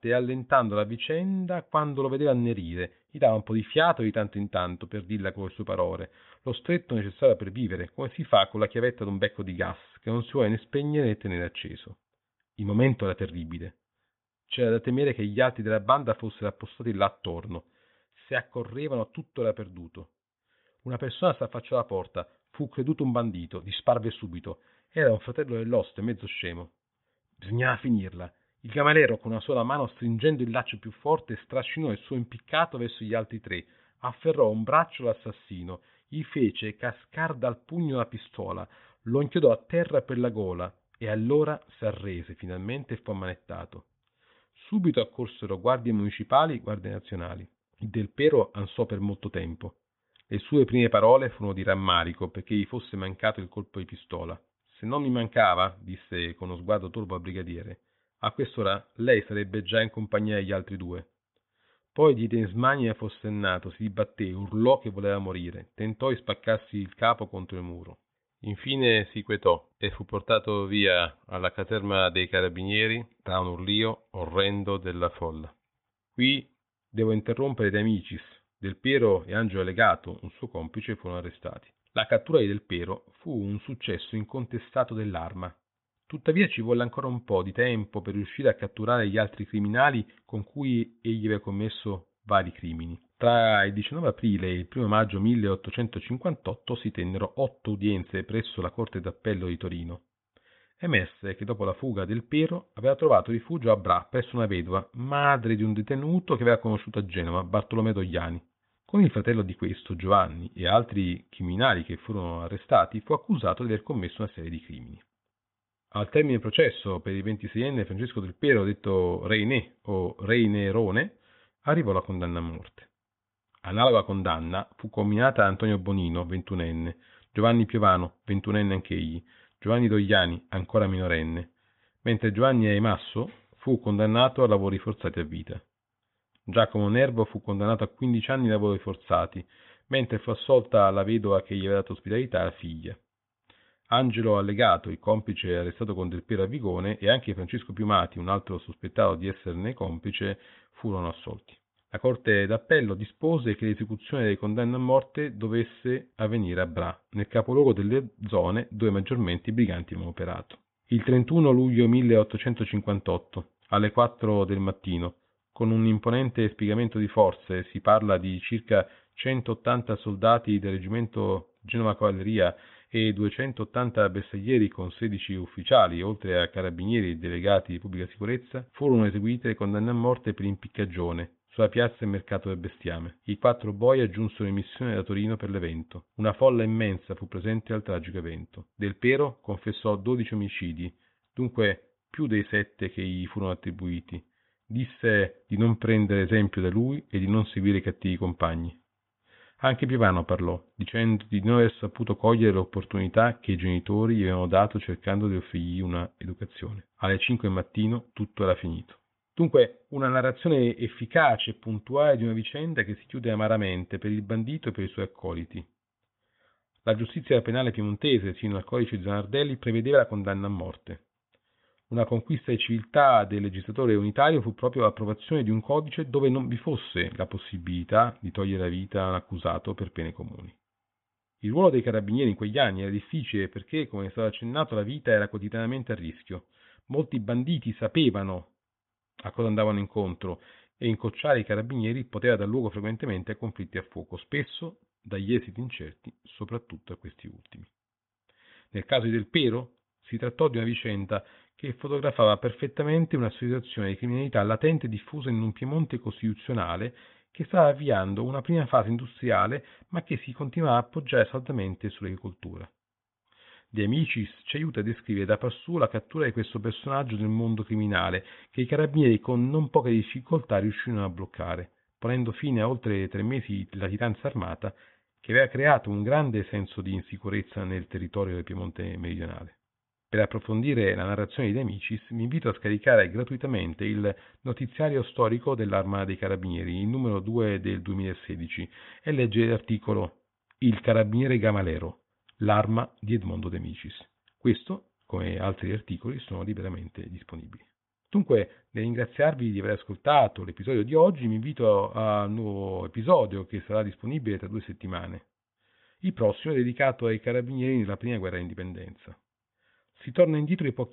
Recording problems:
high frequencies cut off; severe; nothing above 3.5 kHz

